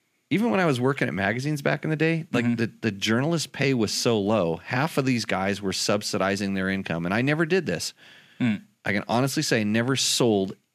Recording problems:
none

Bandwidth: 14.5 kHz